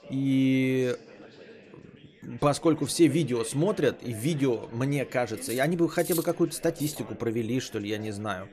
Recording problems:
background chatter; faint; throughout; 4 voices, 20 dB below the speech
clattering dishes; noticeable; from 5.5 to 7 s; peak 7 dB below the speech

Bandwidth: 14 kHz